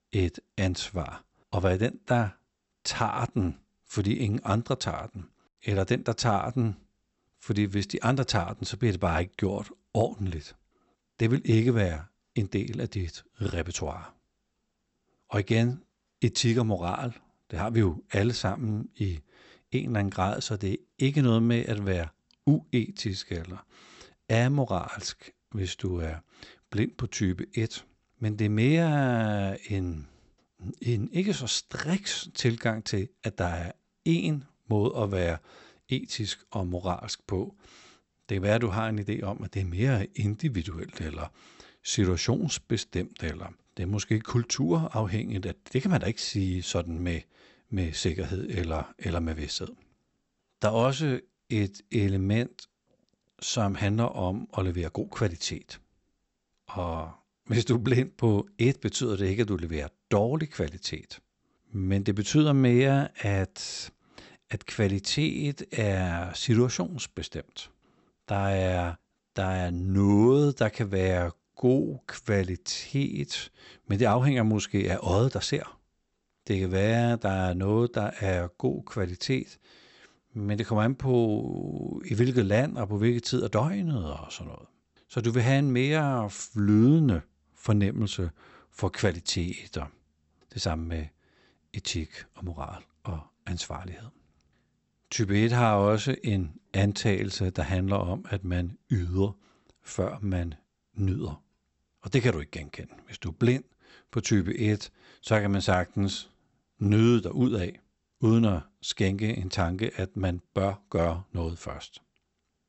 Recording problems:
high frequencies cut off; noticeable; nothing above 8 kHz

